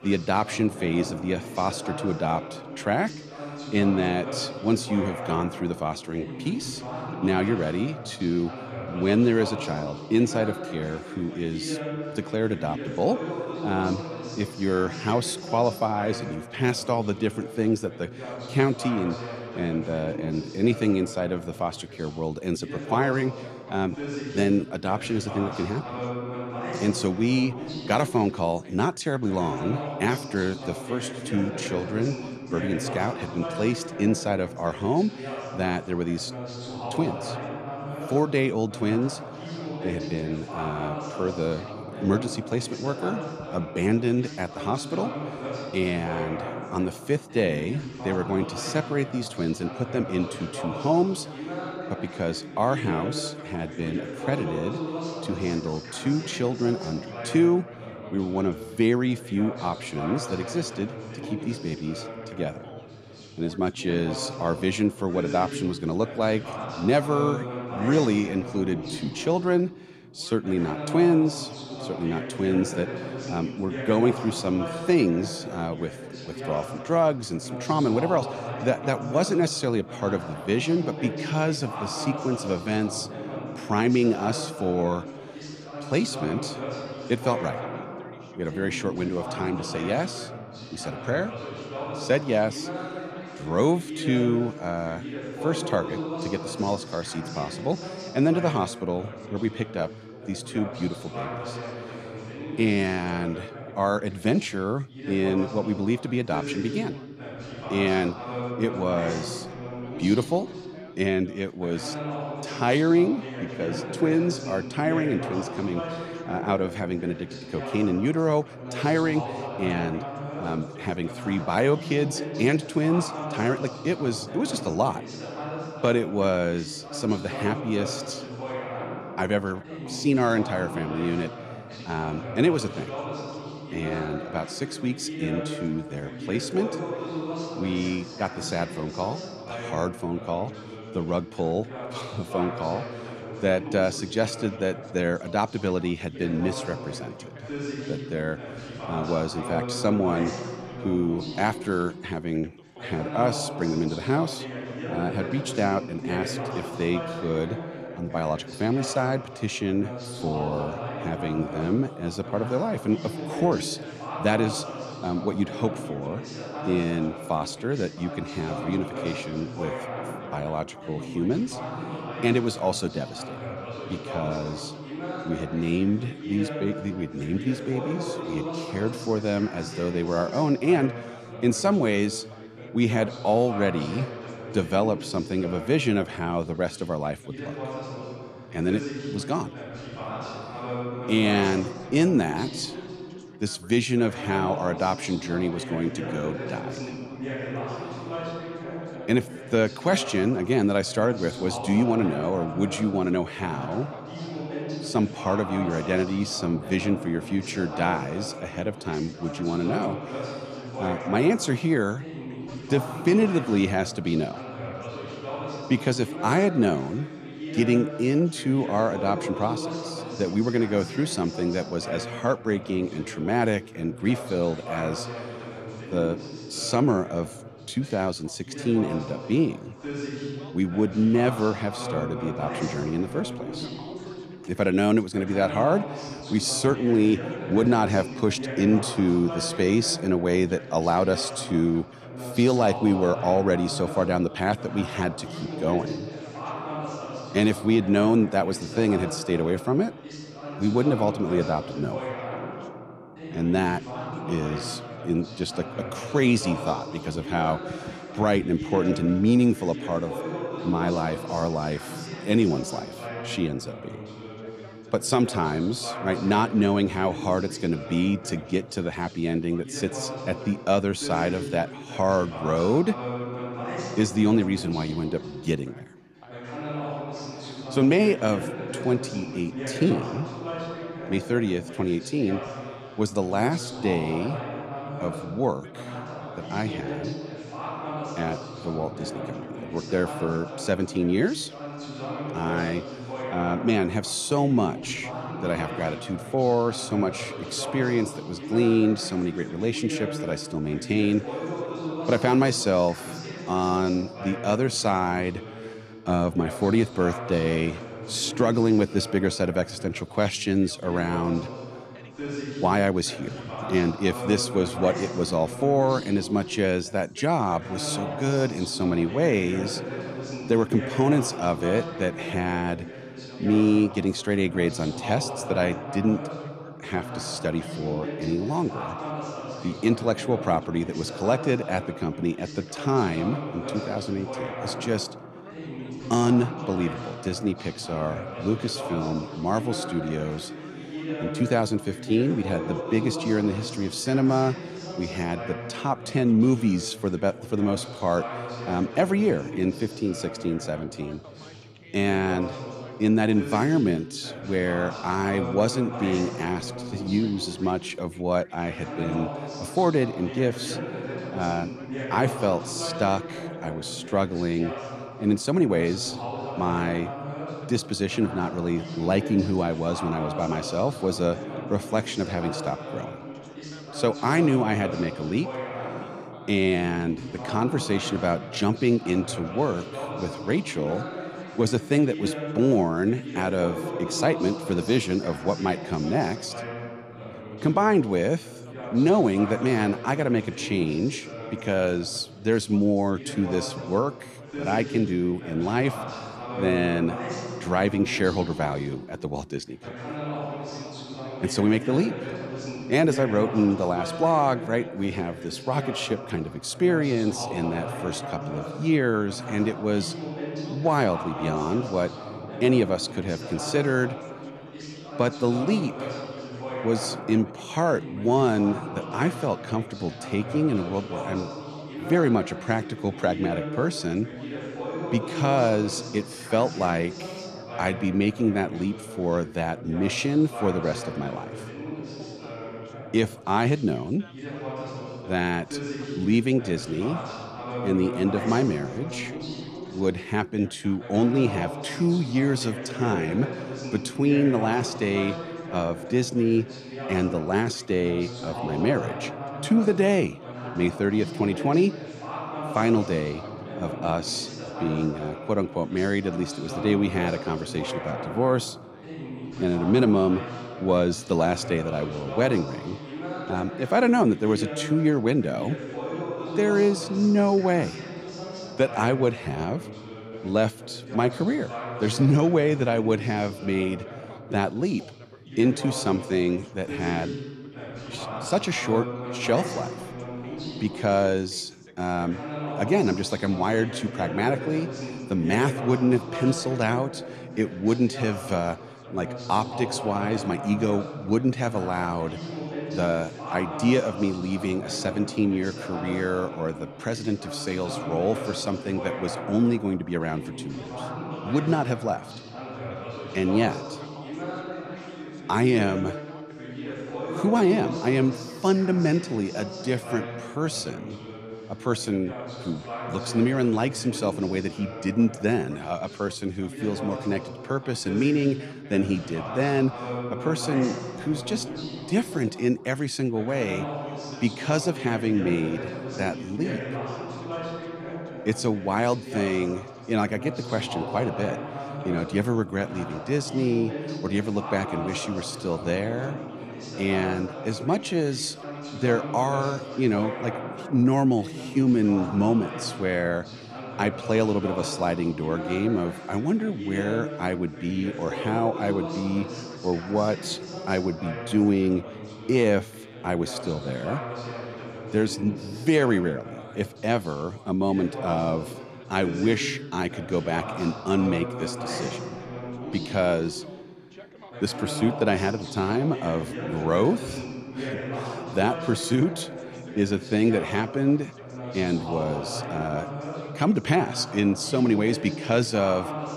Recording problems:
background chatter; loud; throughout; 2 voices, 9 dB below the speech

